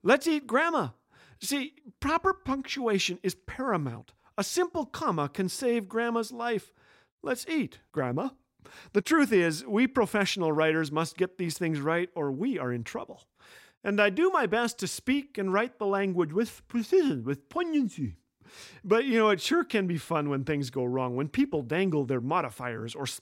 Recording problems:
none

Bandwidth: 16 kHz